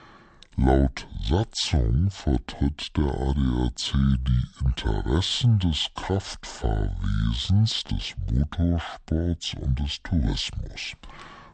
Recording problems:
wrong speed and pitch; too slow and too low; 0.6 times normal speed

